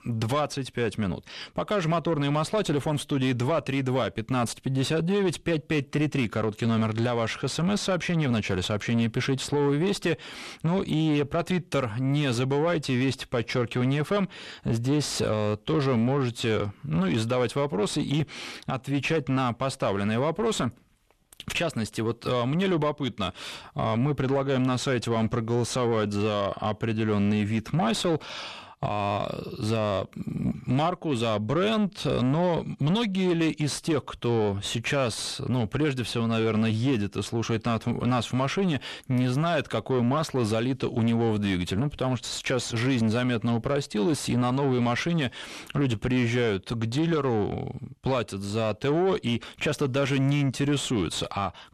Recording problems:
distortion; slight; 10 dB below the speech

